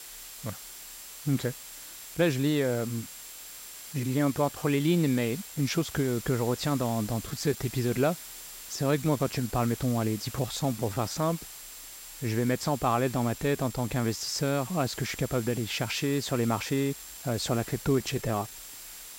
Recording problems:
high-pitched whine; noticeable; throughout; 7.5 kHz, 20 dB below the speech
hiss; noticeable; throughout; 15 dB below the speech
uneven, jittery; strongly; from 2 to 19 s

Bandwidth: 16 kHz